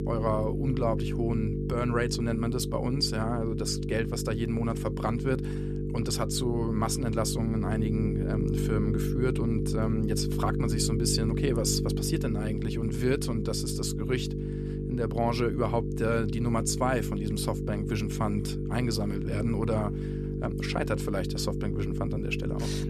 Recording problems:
electrical hum; loud; throughout; 50 Hz, 5 dB below the speech

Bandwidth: 14 kHz